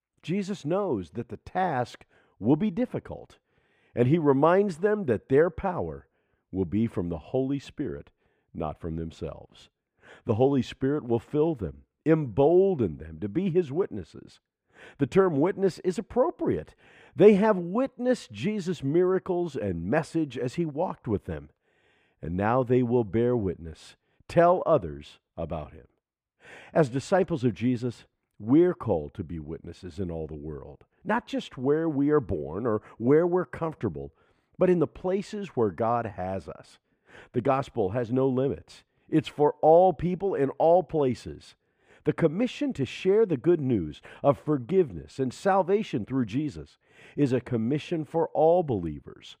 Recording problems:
muffled; slightly; fading above 3.5 kHz

